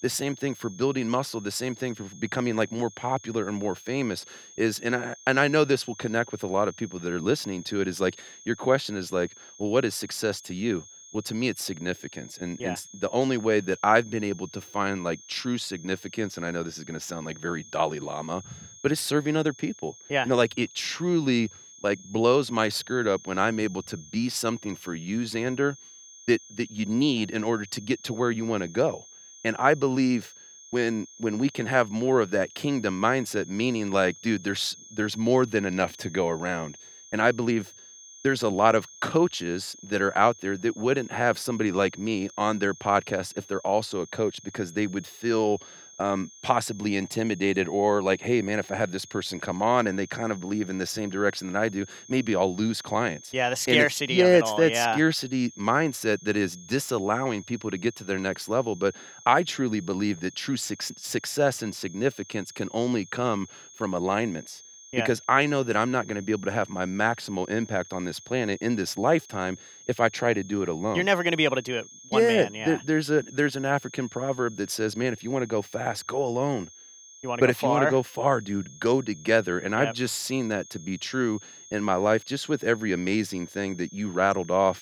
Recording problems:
high-pitched whine; noticeable; throughout; 6.5 kHz, 20 dB below the speech

